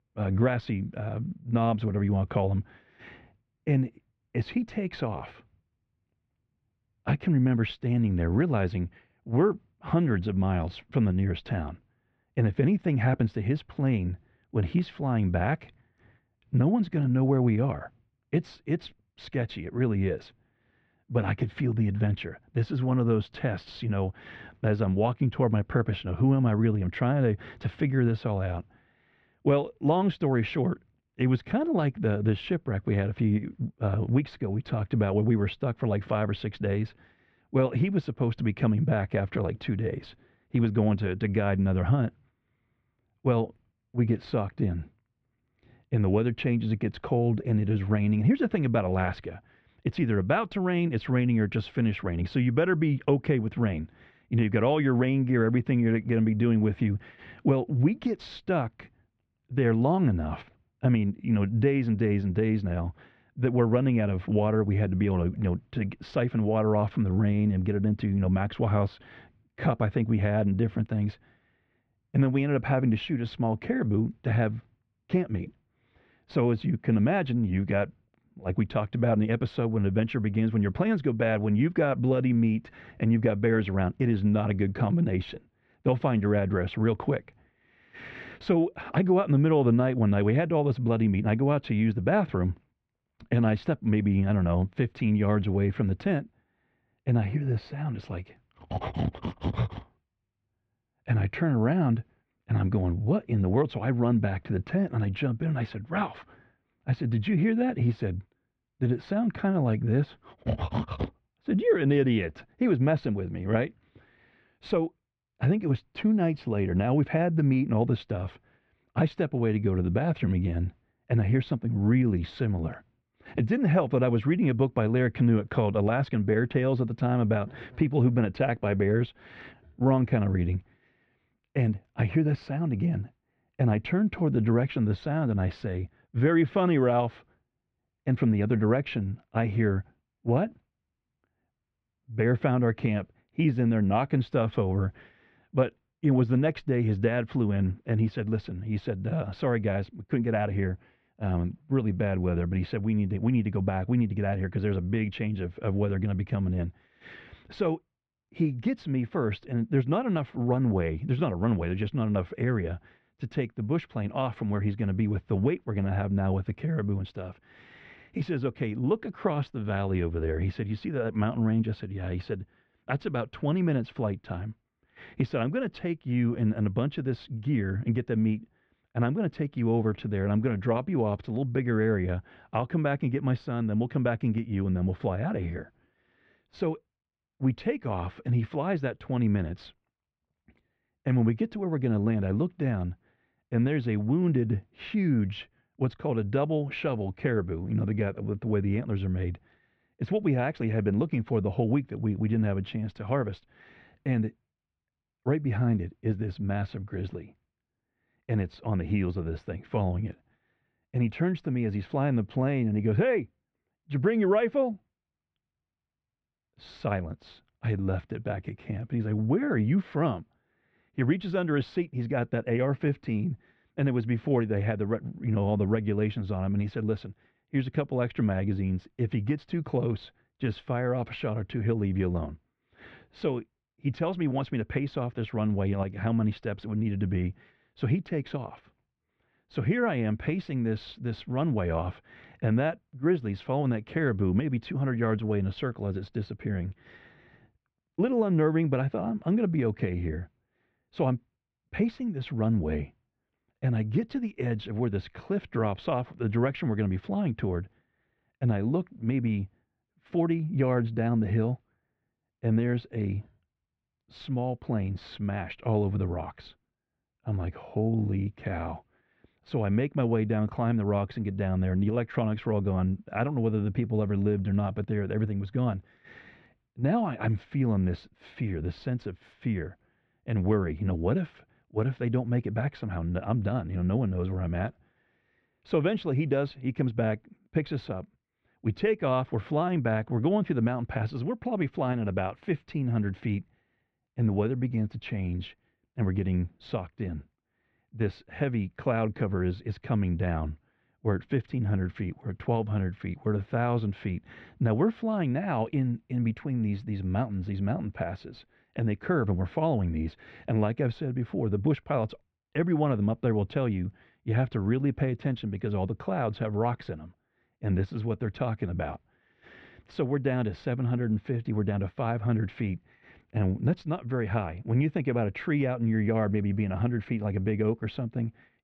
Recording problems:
muffled; very; fading above 2.5 kHz

